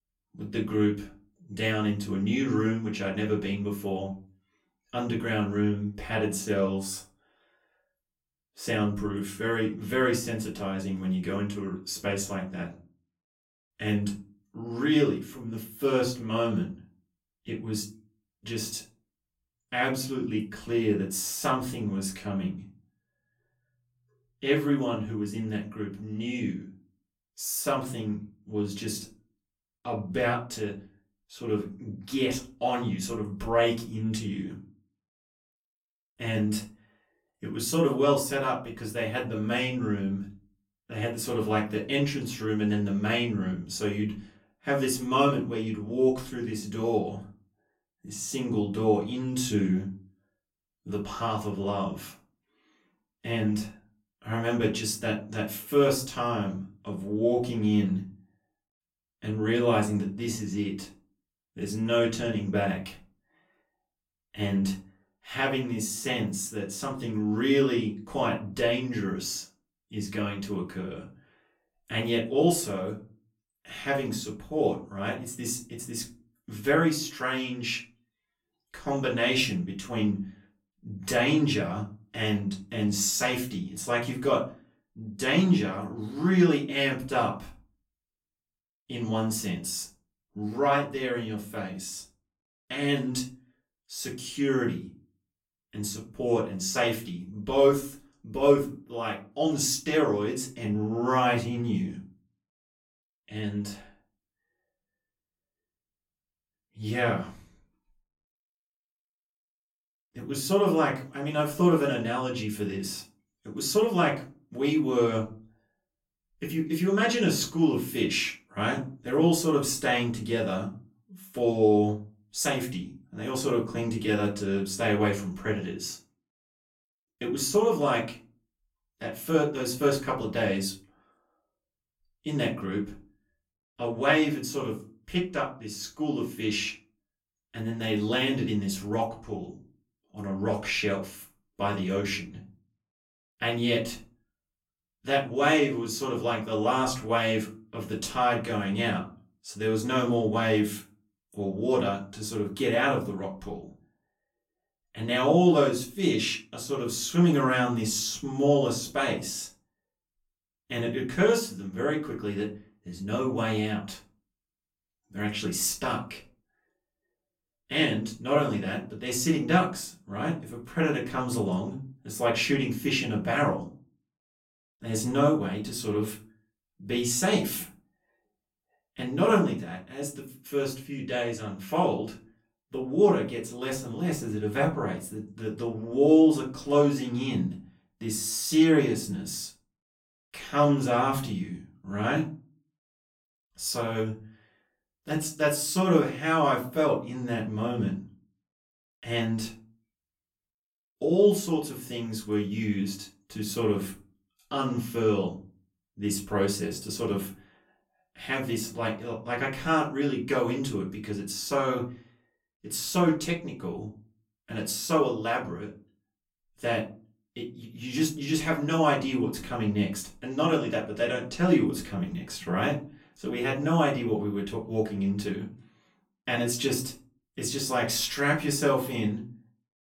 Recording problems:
off-mic speech; far
room echo; slight; dies away in 0.3 s

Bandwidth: 16.5 kHz